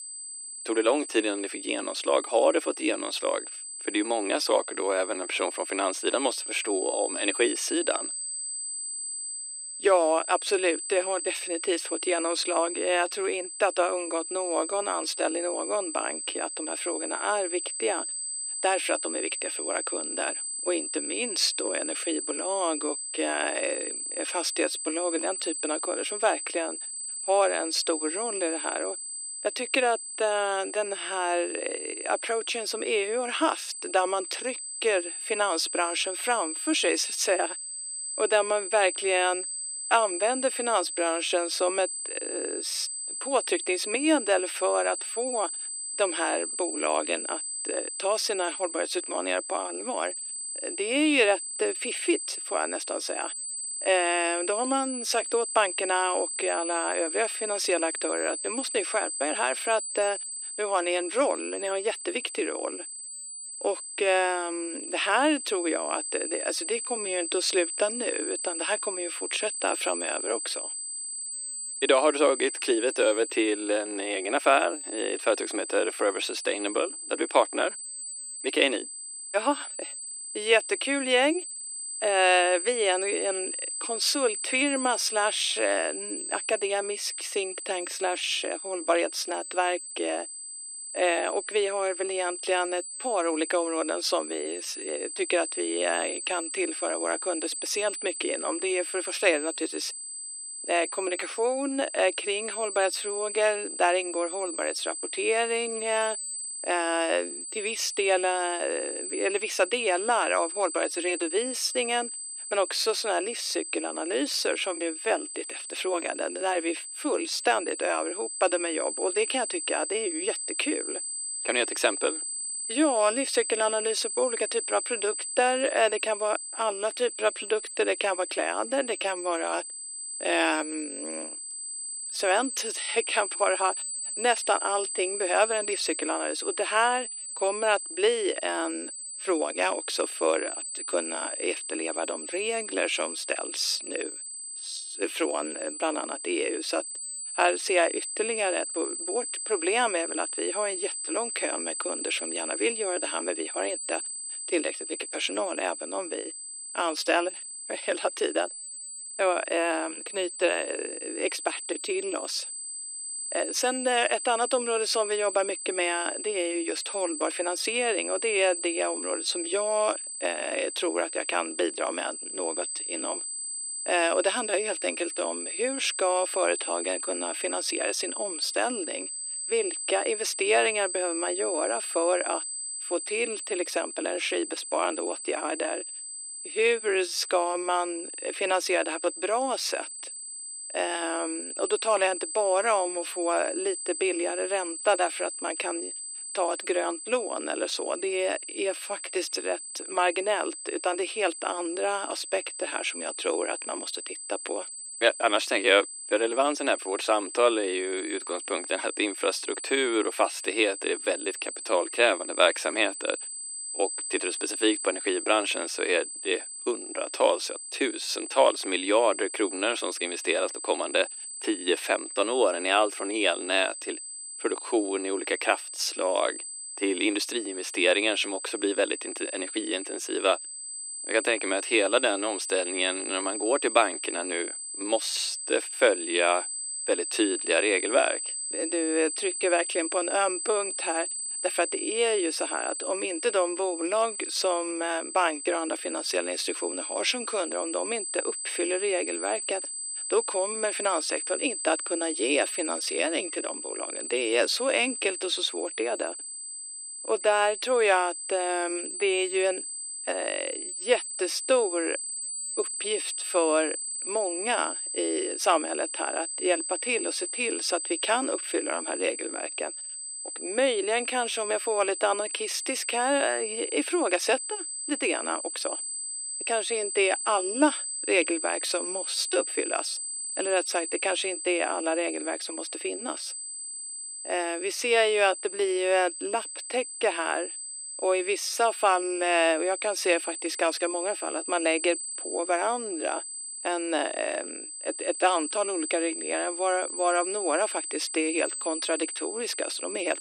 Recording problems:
thin; very; fading below 300 Hz
high-pitched whine; loud; throughout; 8 kHz, 5 dB below the speech

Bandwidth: 14.5 kHz